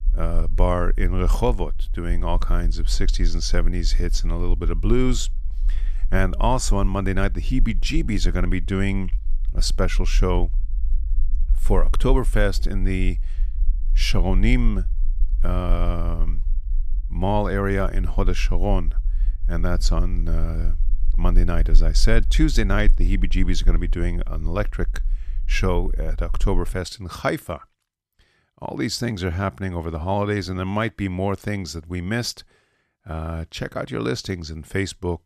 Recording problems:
low rumble; faint; until 27 s; 25 dB below the speech

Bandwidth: 14 kHz